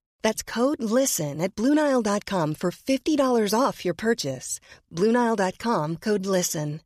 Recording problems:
none

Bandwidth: 14.5 kHz